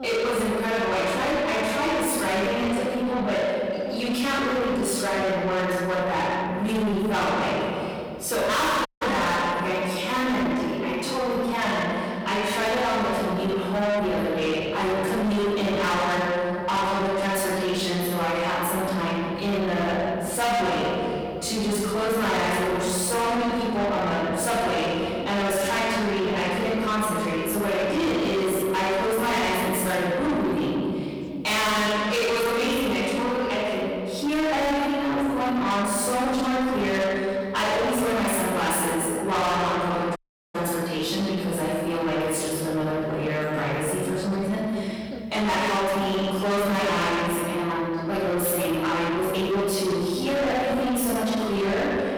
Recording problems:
distortion; heavy; 6 dB below the speech
room echo; strong; dies away in 2.1 s
off-mic speech; far
voice in the background; noticeable; throughout; 20 dB below the speech
audio cutting out; at 9 s and at 40 s

